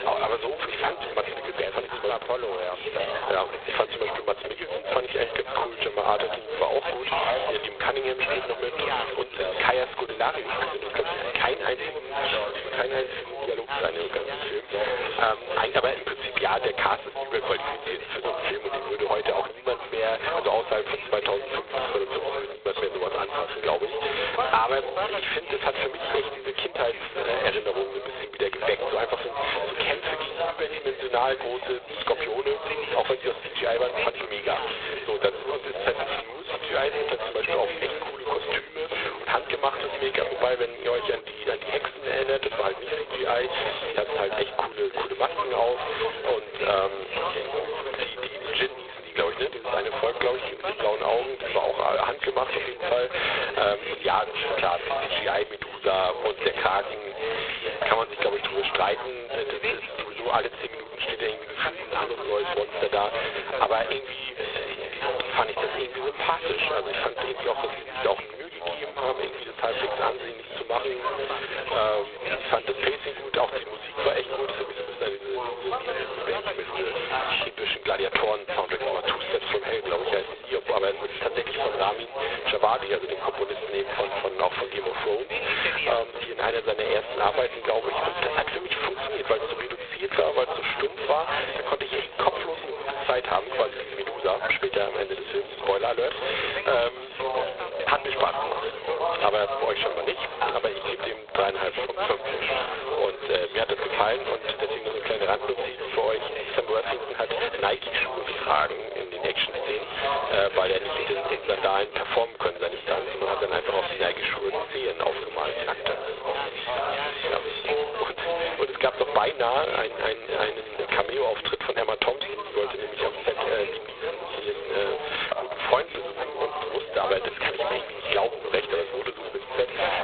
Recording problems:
phone-call audio; poor line; nothing above 4 kHz
squashed, flat; heavily, background pumping
background chatter; loud; throughout; 3 voices, 5 dB below the speech

